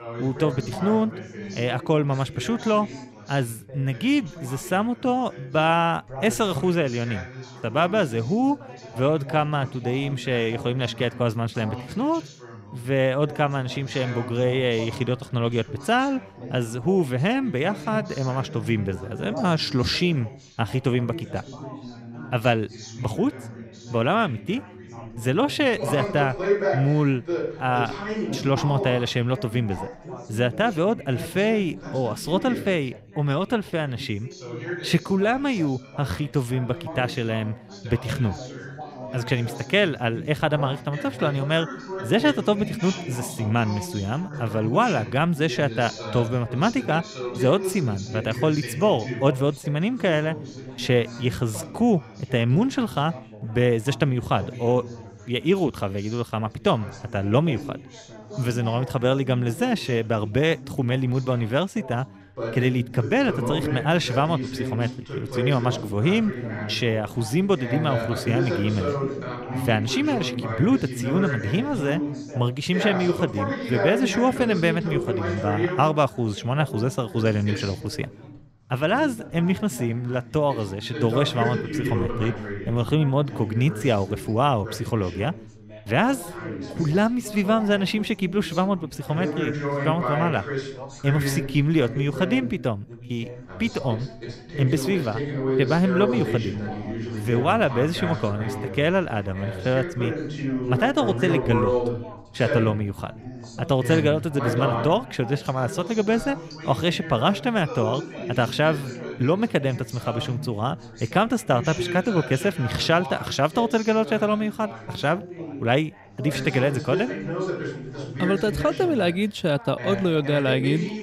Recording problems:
background chatter; loud; throughout; 4 voices, 8 dB below the speech

